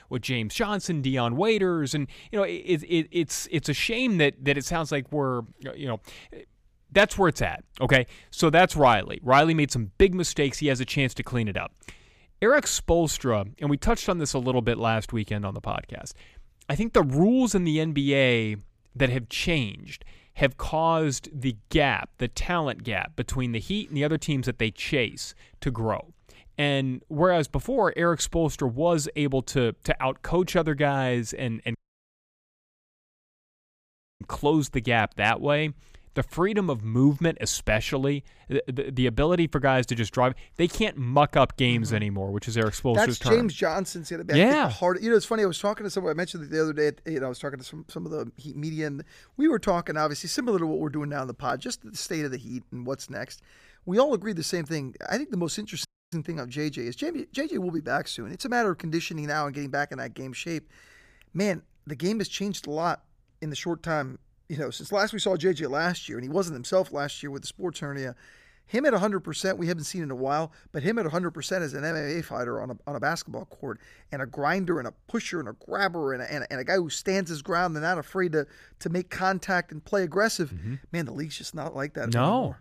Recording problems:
audio cutting out; at 32 s for 2.5 s and at 56 s

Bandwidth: 15 kHz